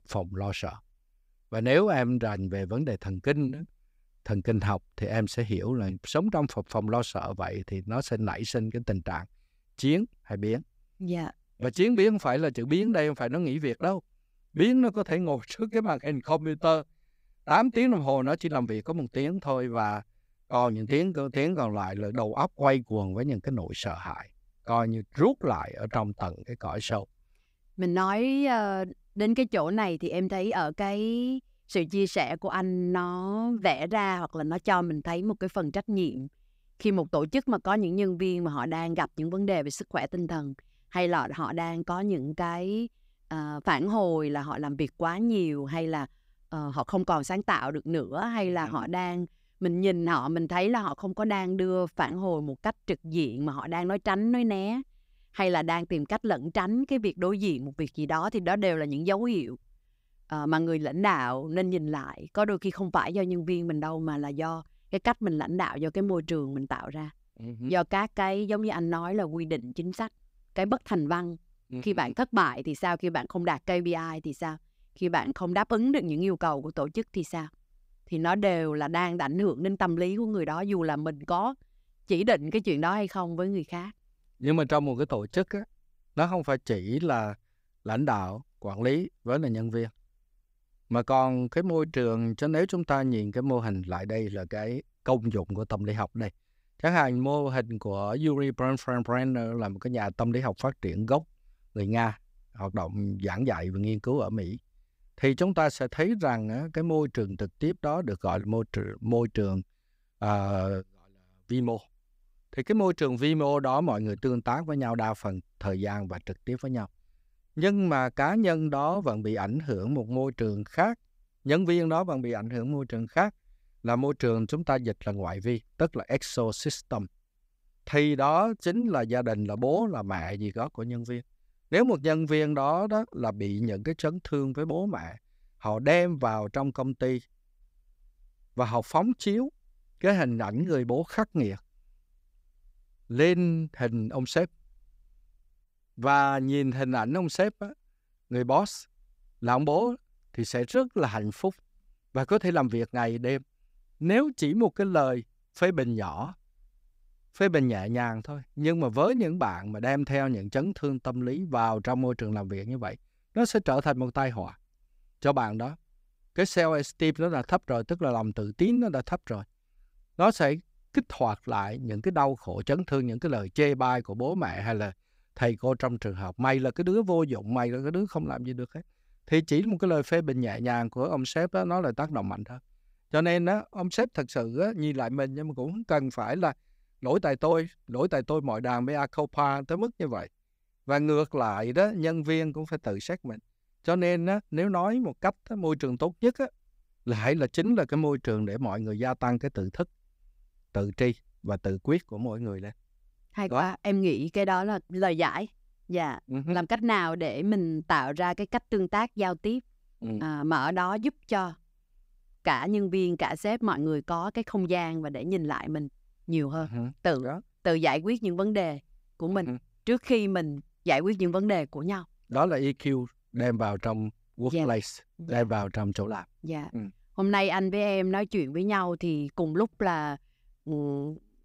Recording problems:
none

